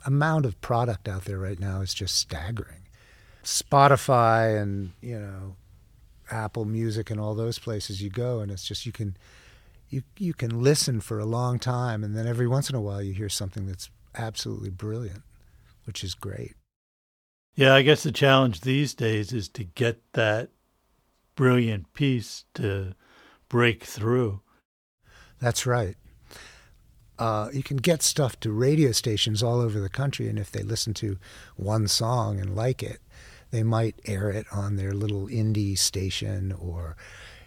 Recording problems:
none

